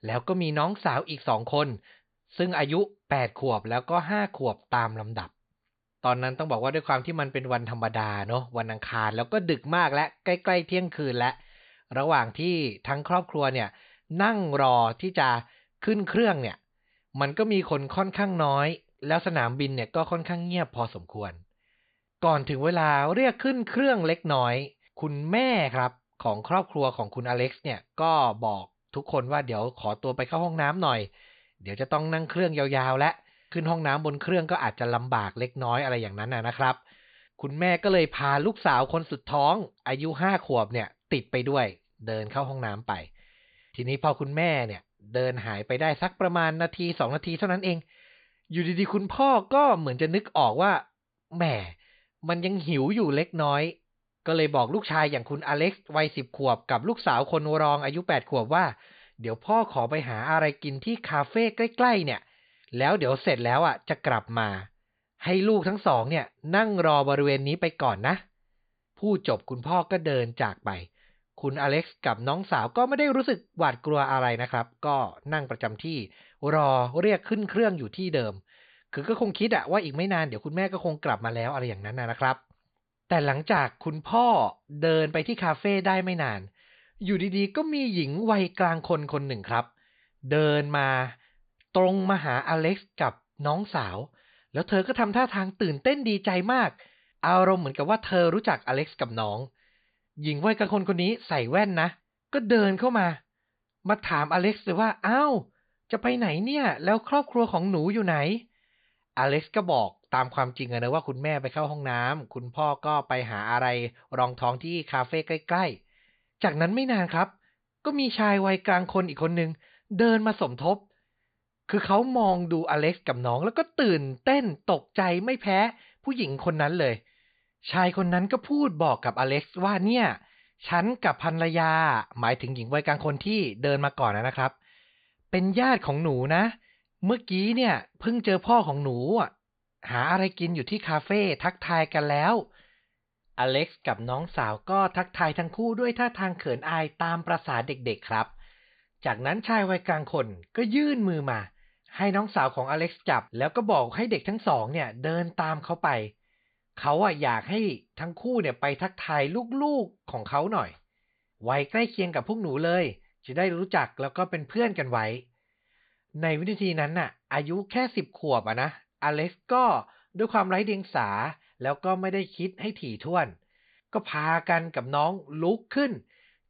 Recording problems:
high frequencies cut off; severe; nothing above 4.5 kHz

